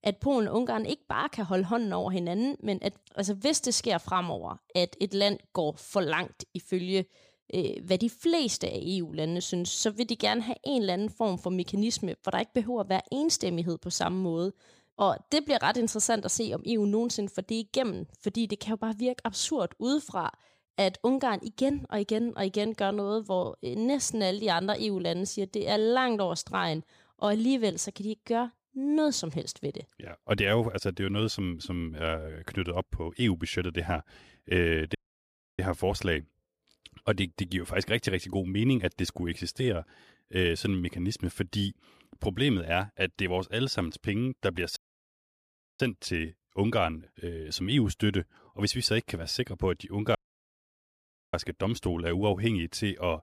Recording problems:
audio cutting out; at 35 s for 0.5 s, at 45 s for 1 s and at 50 s for 1 s

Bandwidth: 15 kHz